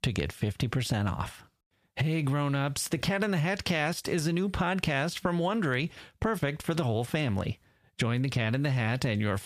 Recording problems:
squashed, flat; heavily

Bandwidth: 14.5 kHz